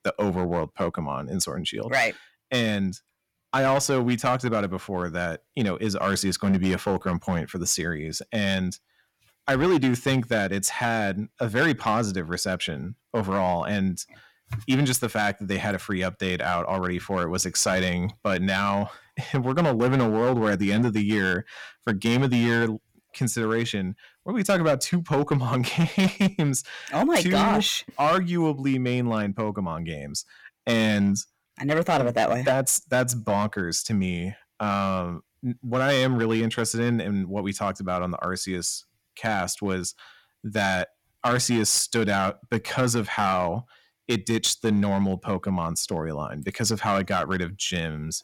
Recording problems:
distortion; slight; 5% of the sound clipped

